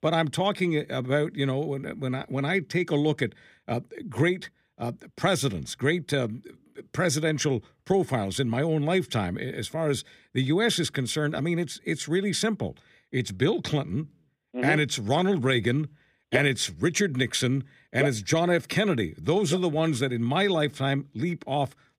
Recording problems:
none

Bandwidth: 15.5 kHz